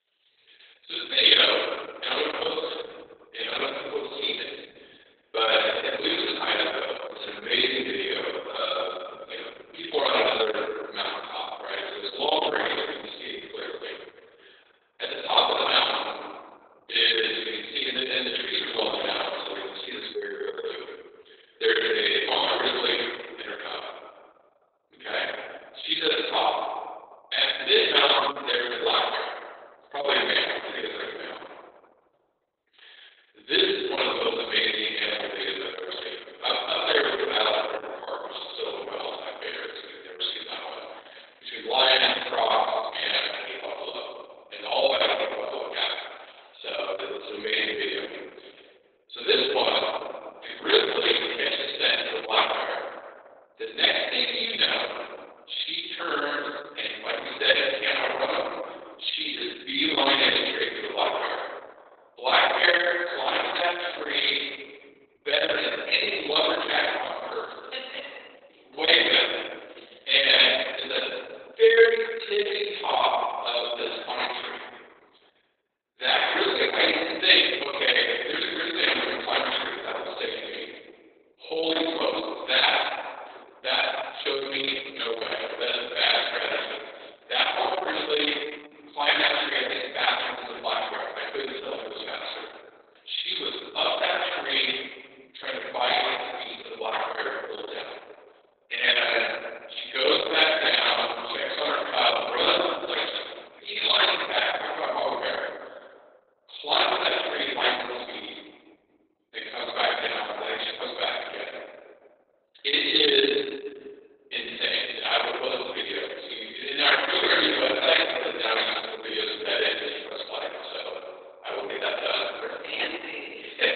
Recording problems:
off-mic speech; far
garbled, watery; badly; nothing above 4 kHz
room echo; noticeable; dies away in 1.4 s
thin; somewhat; fading below 350 Hz

